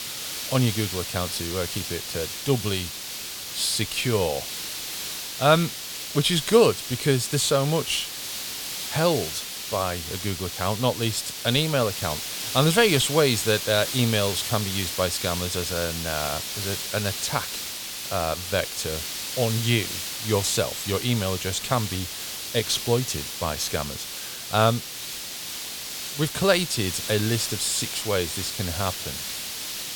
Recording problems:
hiss; loud; throughout; 5 dB below the speech

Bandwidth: 18 kHz